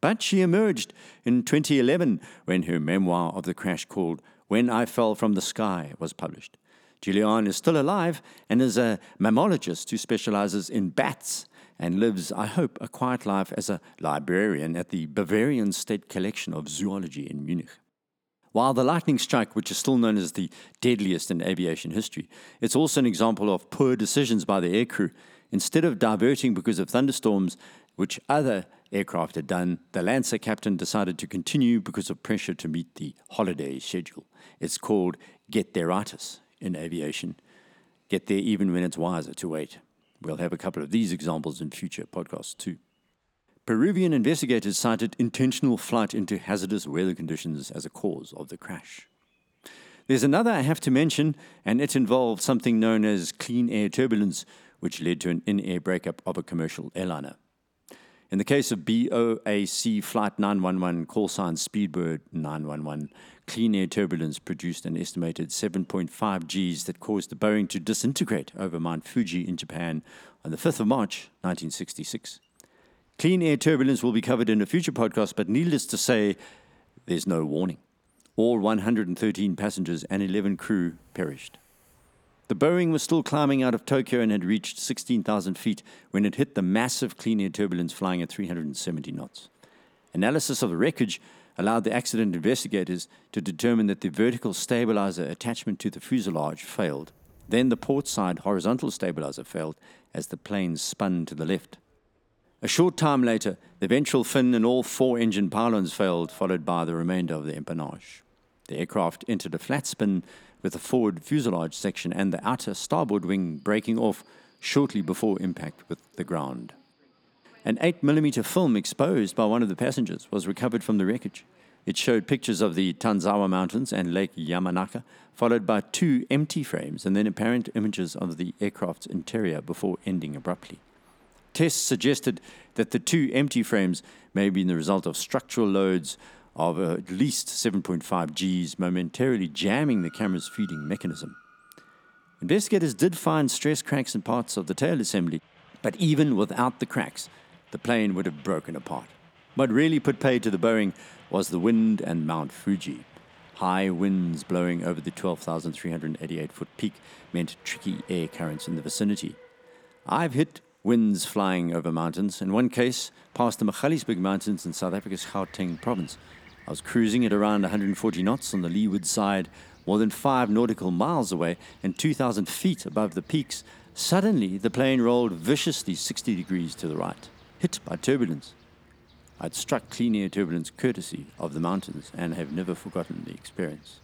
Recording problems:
train or aircraft noise; faint; throughout; 30 dB below the speech

